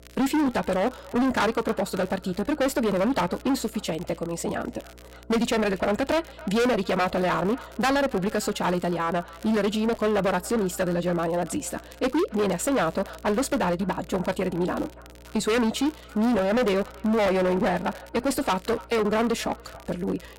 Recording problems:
distortion; heavy; 18% of the sound clipped
wrong speed, natural pitch; too fast; 1.5 times normal speed
echo of what is said; faint; throughout; 280 ms later, 20 dB below the speech
electrical hum; faint; throughout; 60 Hz, 30 dB below the speech
crackle, like an old record; faint; 25 dB below the speech

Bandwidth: 16 kHz